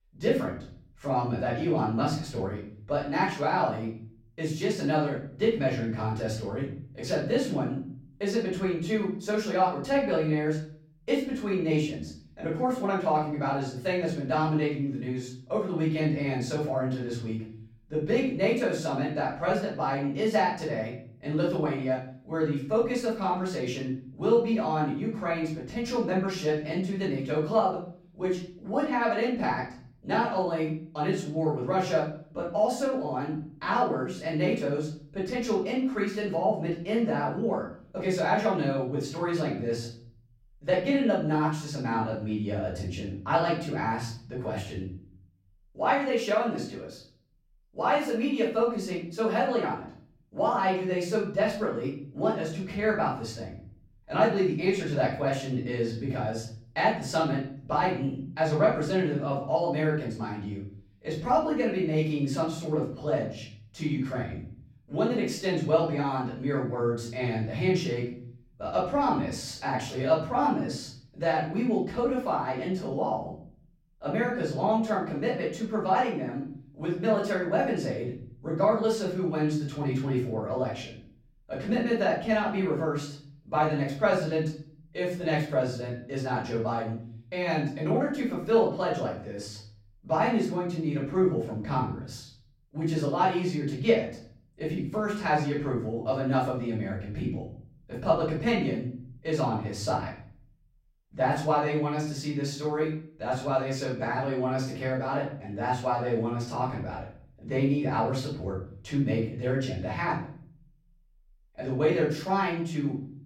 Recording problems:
off-mic speech; far
room echo; noticeable; dies away in 0.5 s

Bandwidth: 16 kHz